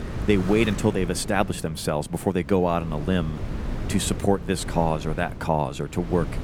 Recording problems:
traffic noise; noticeable; throughout; 15 dB below the speech
wind noise on the microphone; occasional gusts; 15 dB below the speech

